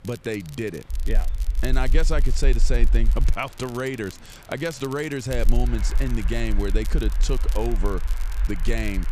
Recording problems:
train or aircraft noise; noticeable; throughout; 20 dB below the speech
crackle, like an old record; noticeable; 15 dB below the speech
chatter from many people; faint; throughout; 30 dB below the speech
low rumble; faint; from 1 to 3.5 s and from 5.5 s on; 20 dB below the speech

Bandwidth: 14.5 kHz